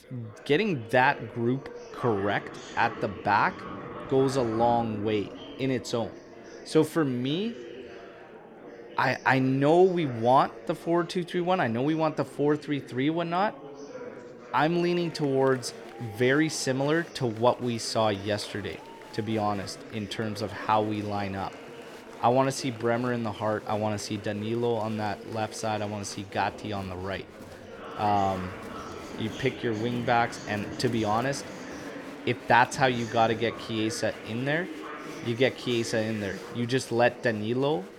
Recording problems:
murmuring crowd; noticeable; throughout; 15 dB below the speech

